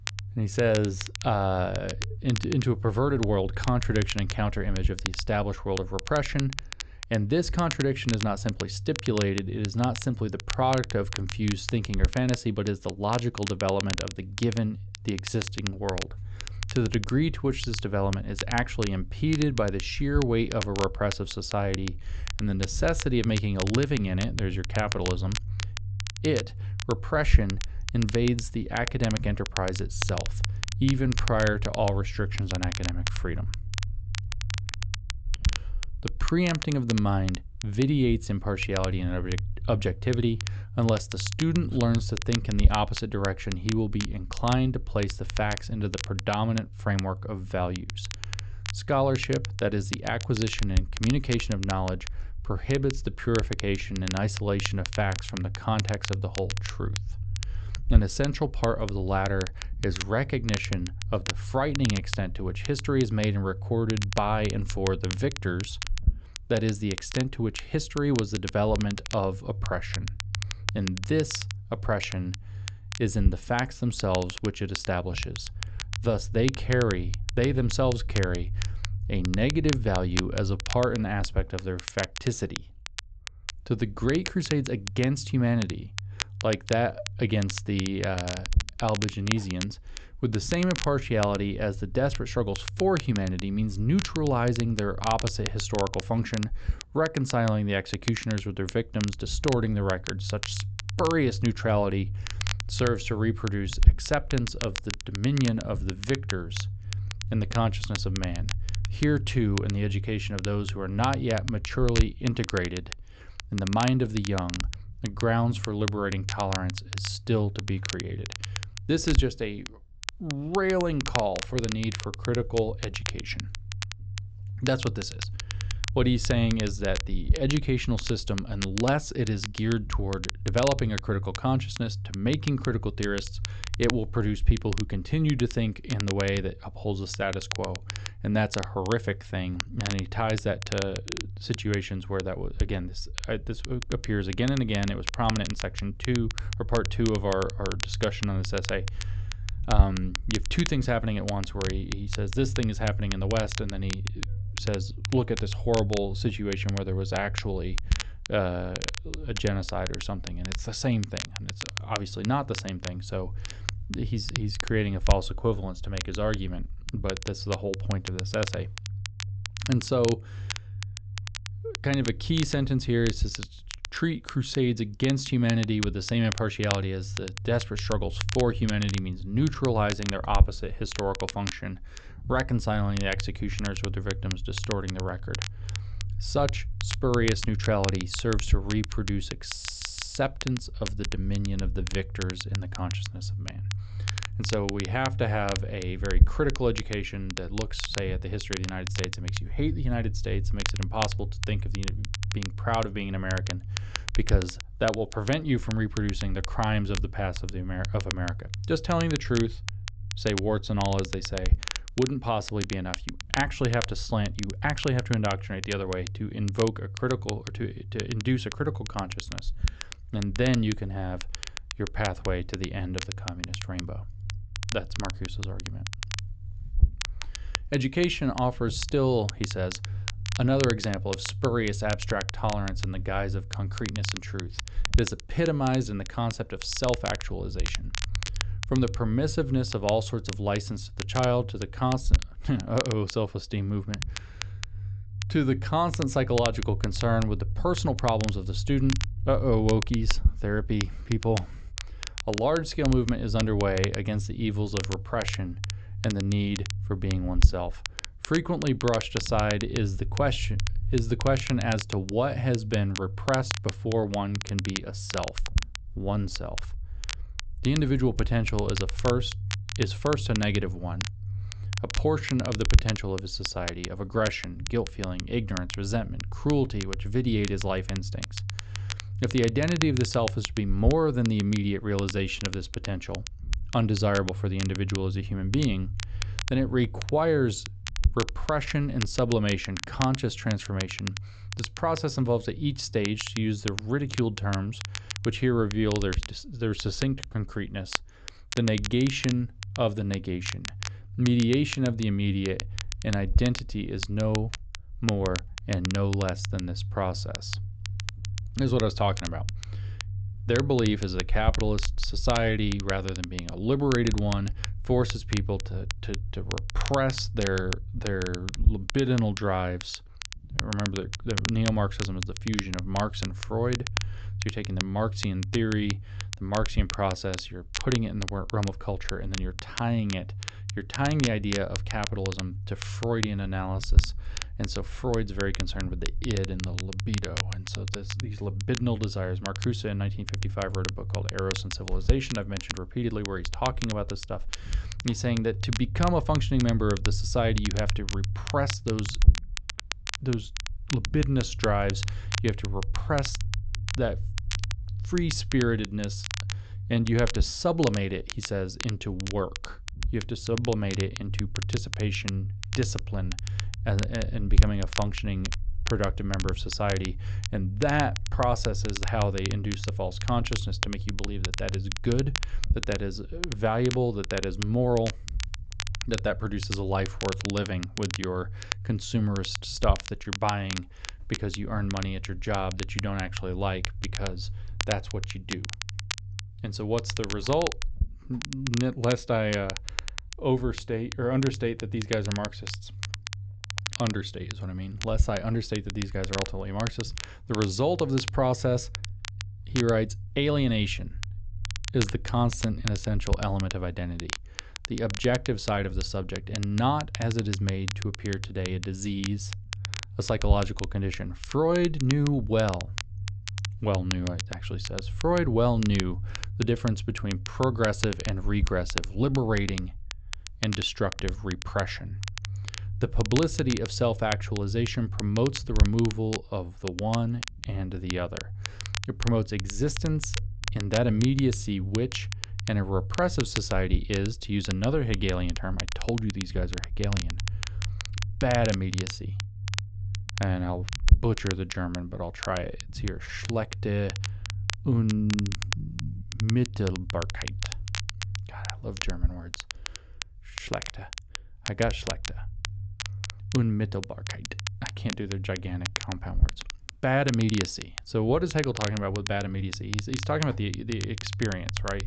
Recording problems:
high frequencies cut off; noticeable; nothing above 8 kHz
crackle, like an old record; loud; 9 dB below the speech
low rumble; faint; throughout; 20 dB below the speech
audio stuttering; at 3:09

